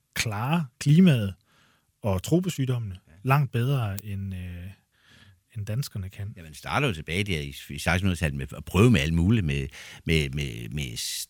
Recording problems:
none

